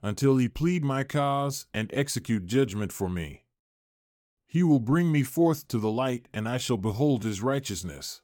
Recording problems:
none

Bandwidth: 17 kHz